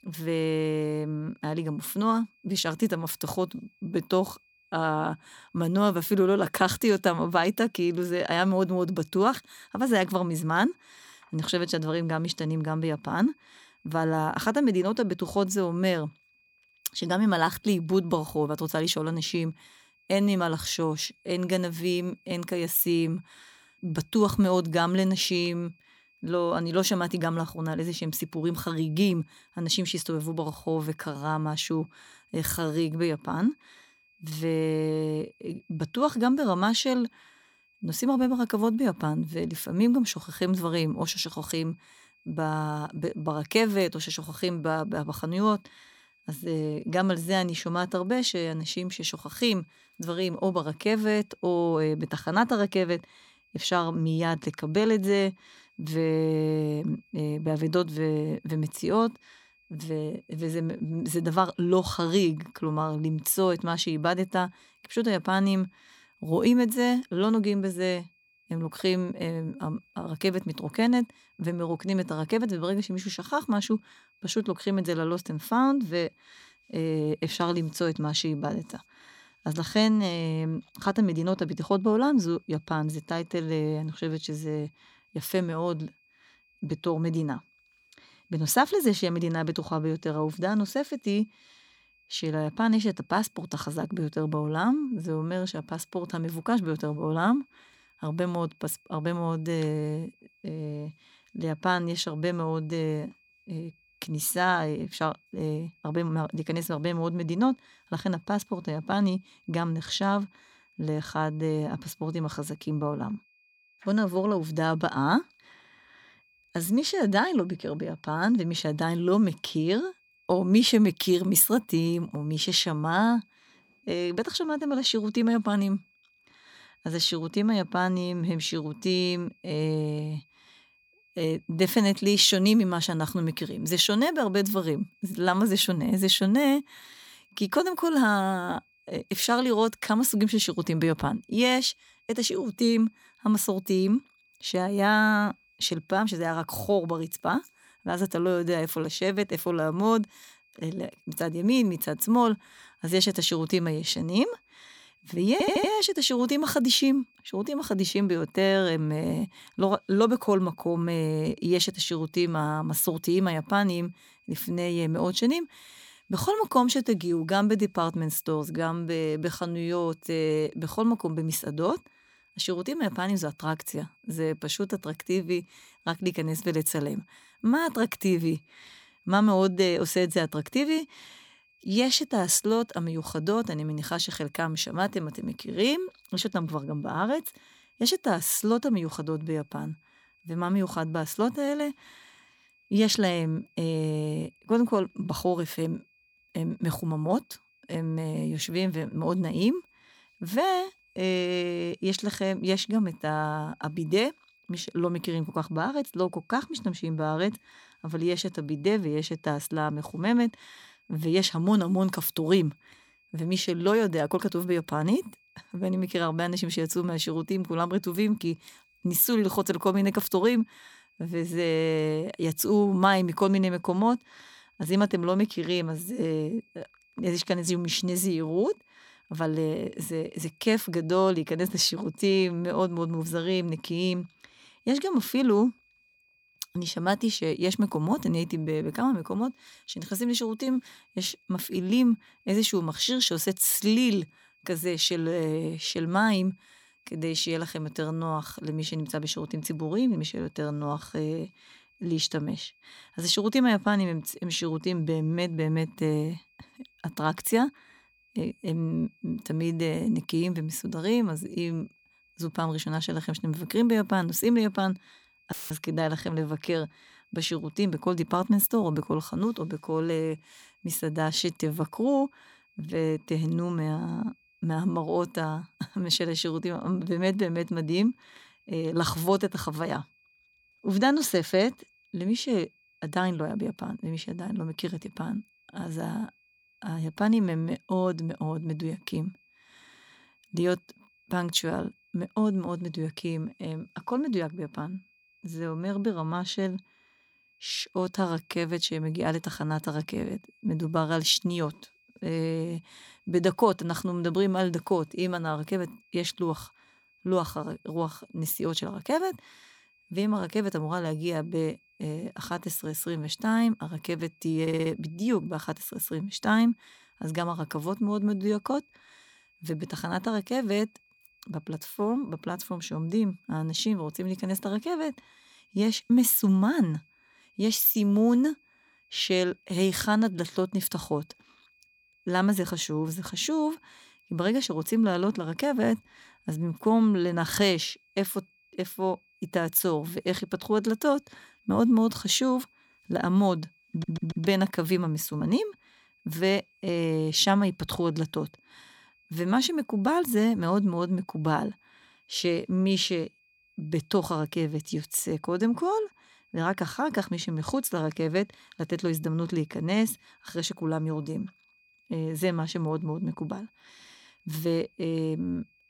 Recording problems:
high-pitched whine; faint; throughout; 2.5 kHz, 35 dB below the speech
audio stuttering; at 2:35, at 5:14 and at 5:44
audio cutting out; filled with static; at 4:25

